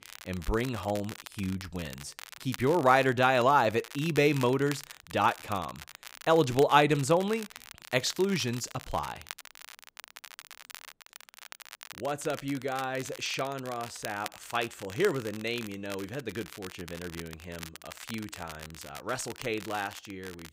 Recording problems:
crackle, like an old record; noticeable; 15 dB below the speech

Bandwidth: 15.5 kHz